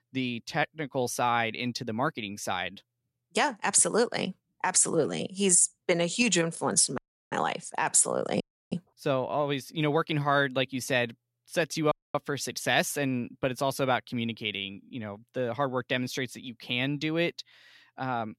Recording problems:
audio cutting out; at 7 s, at 8.5 s and at 12 s

